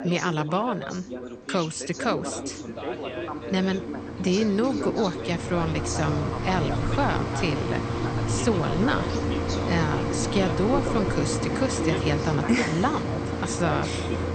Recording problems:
garbled, watery; slightly; nothing above 8.5 kHz
machinery noise; loud; throughout; 2 dB below the speech
background chatter; loud; throughout; 2 voices, 8 dB below the speech

